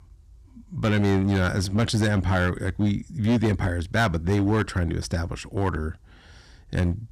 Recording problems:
distortion; slight; 8% of the sound clipped

